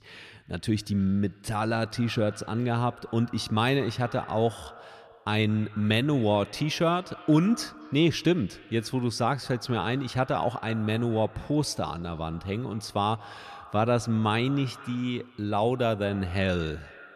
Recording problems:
echo of what is said; faint; throughout; 220 ms later, 20 dB below the speech

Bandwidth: 14 kHz